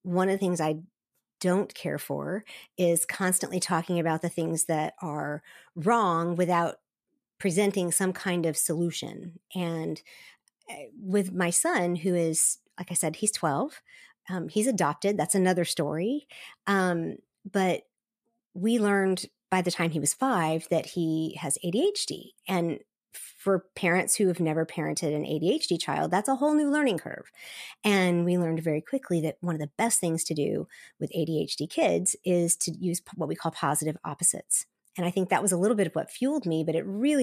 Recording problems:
abrupt cut into speech; at the end

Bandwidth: 14.5 kHz